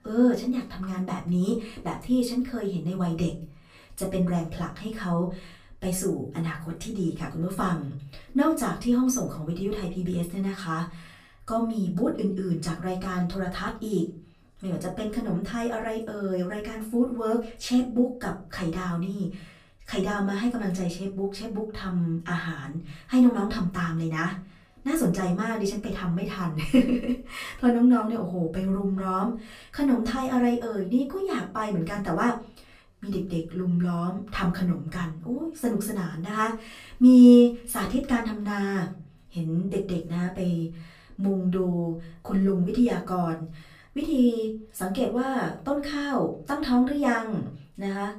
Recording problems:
off-mic speech; far
room echo; slight; dies away in 0.3 s

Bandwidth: 15 kHz